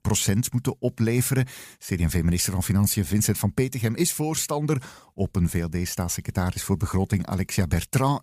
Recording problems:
none

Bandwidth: 15 kHz